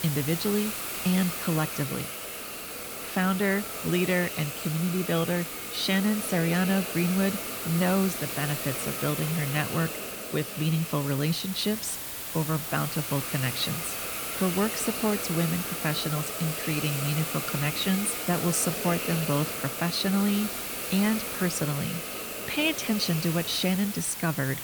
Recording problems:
hiss; loud; throughout; 3 dB below the speech

